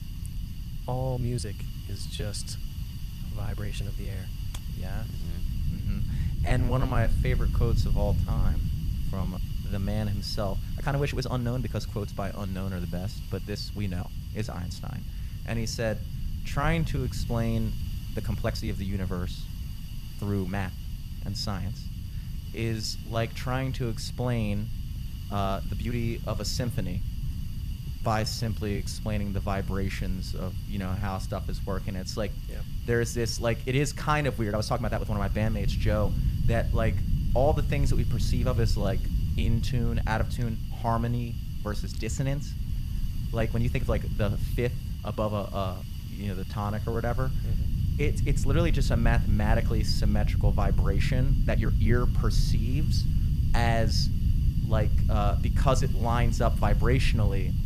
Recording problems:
hiss; noticeable; throughout; 20 dB below the speech
low rumble; noticeable; throughout; 15 dB below the speech
uneven, jittery; strongly; from 1 to 56 s

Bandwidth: 14.5 kHz